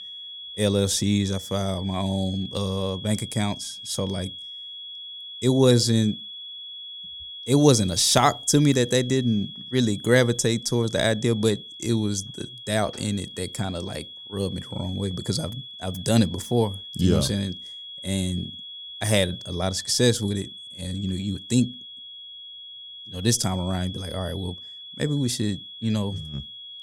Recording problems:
high-pitched whine; noticeable; throughout; 3.5 kHz, 15 dB below the speech

